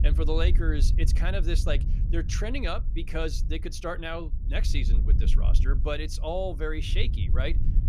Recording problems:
wind noise on the microphone; occasional gusts; 15 dB below the speech

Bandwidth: 15 kHz